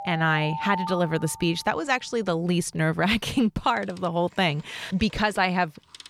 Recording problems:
alarms or sirens; loud; throughout; 10 dB below the speech

